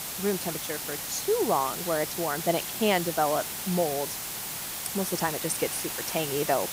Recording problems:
hiss; loud; throughout; 3 dB below the speech
machinery noise; noticeable; throughout; 20 dB below the speech

